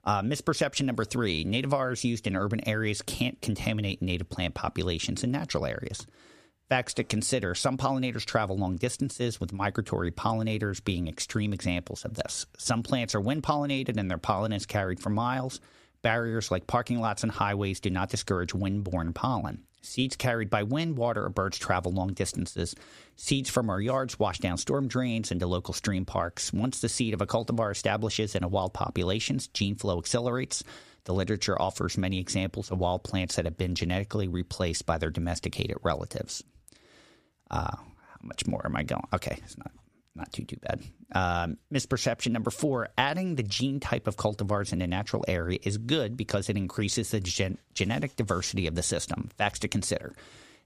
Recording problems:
squashed, flat; somewhat

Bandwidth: 15 kHz